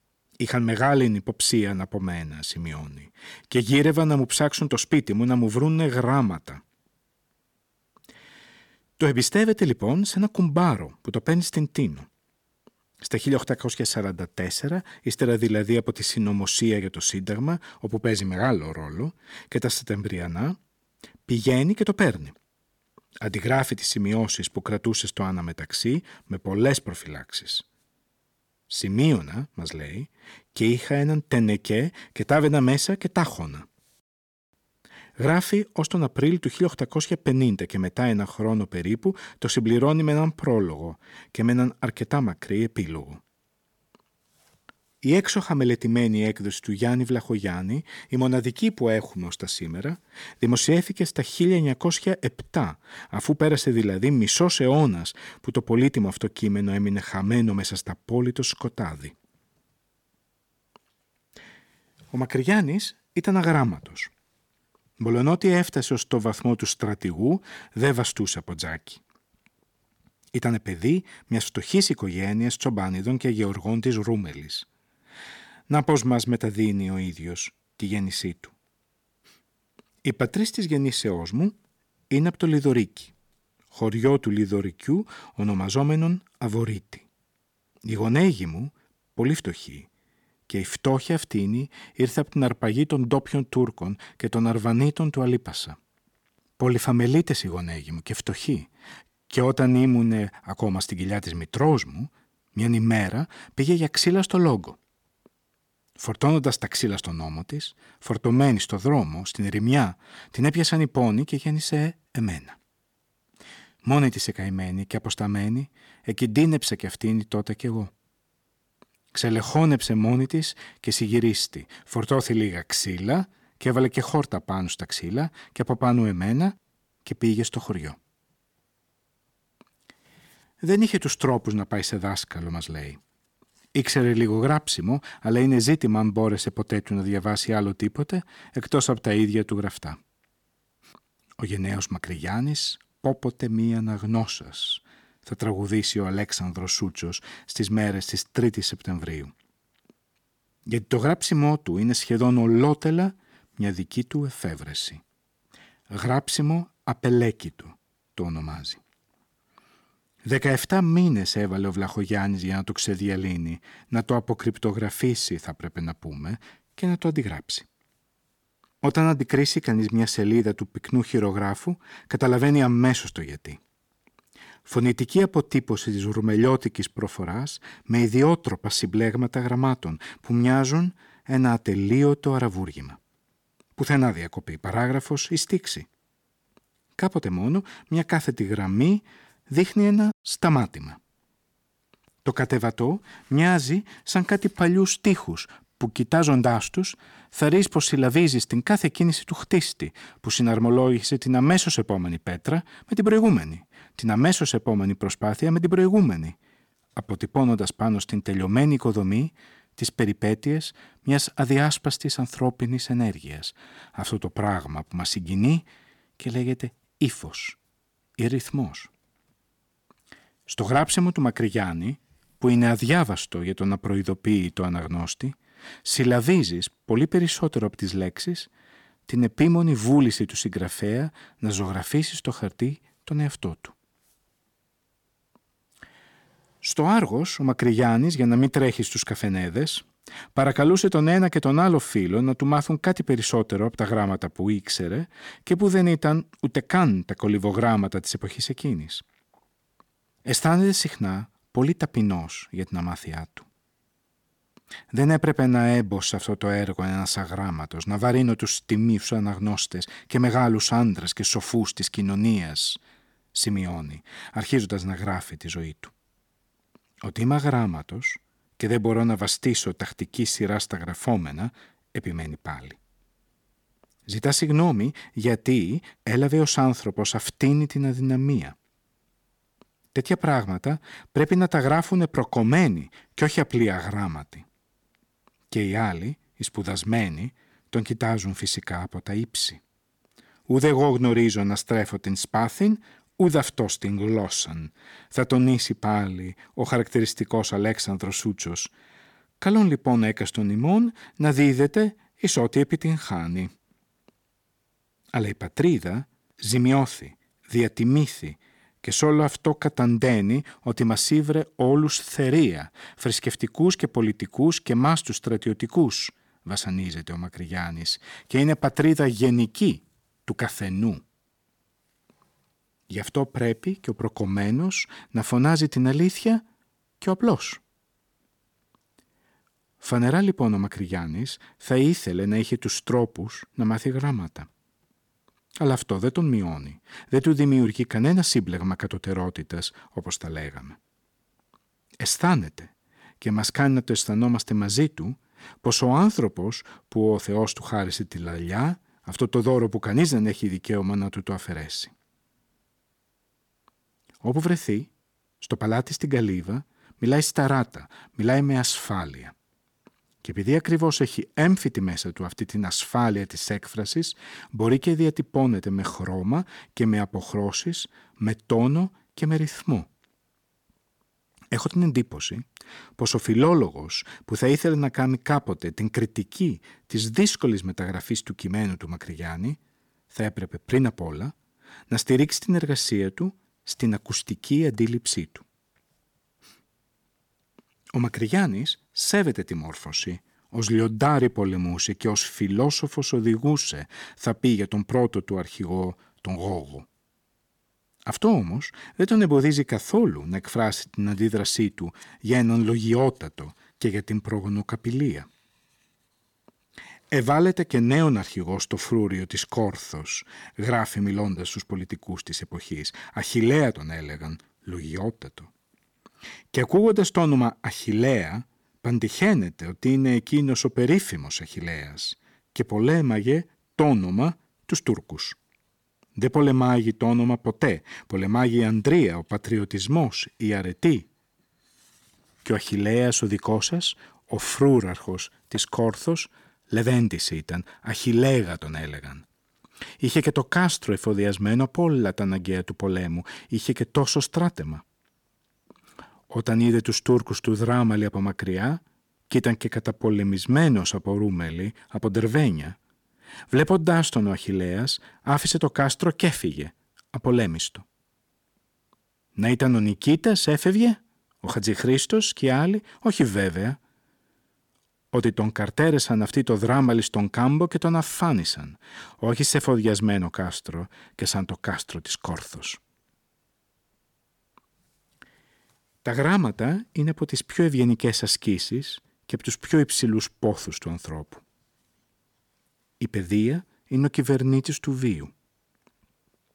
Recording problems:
none

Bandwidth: 18.5 kHz